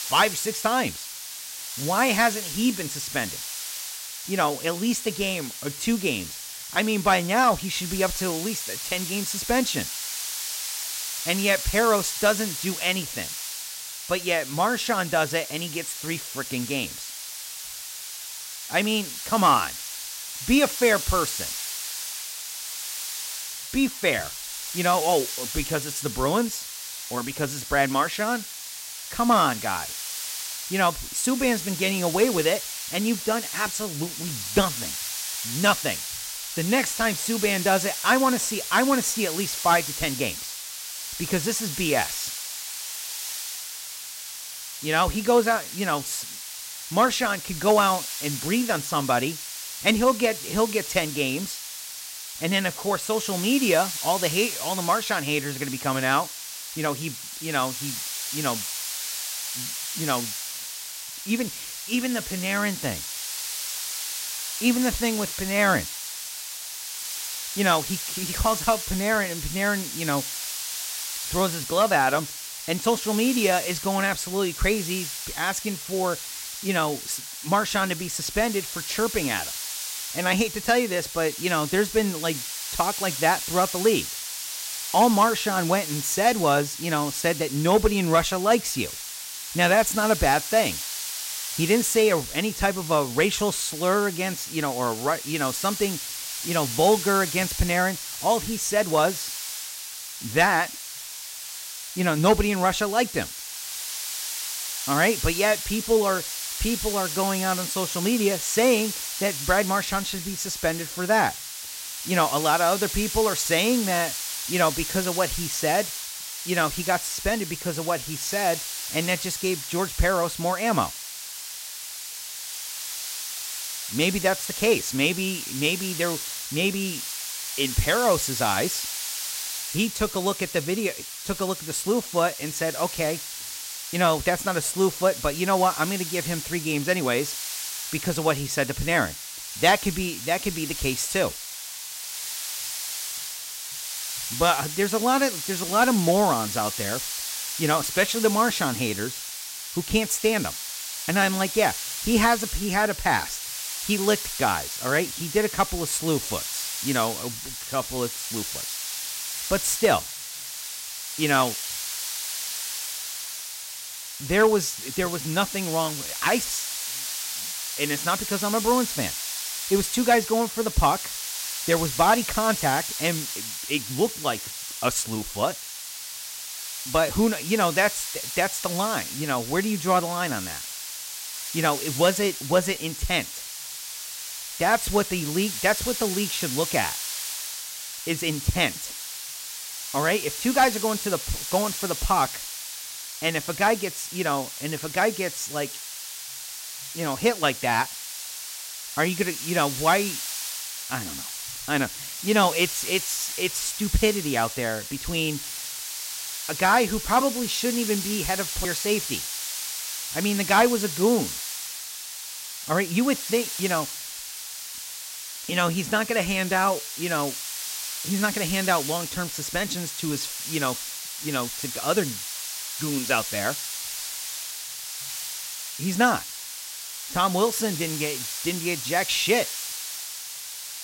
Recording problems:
hiss; loud; throughout; 6 dB below the speech

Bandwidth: 16 kHz